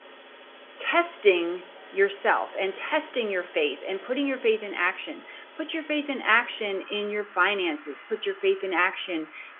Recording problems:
phone-call audio; nothing above 3.5 kHz
traffic noise; noticeable; throughout; 20 dB below the speech

